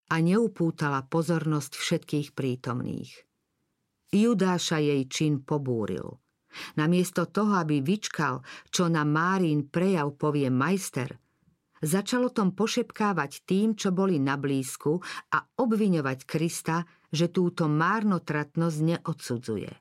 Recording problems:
none

